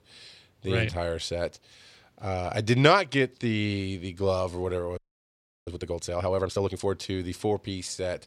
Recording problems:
audio freezing; at 5 s for 0.5 s

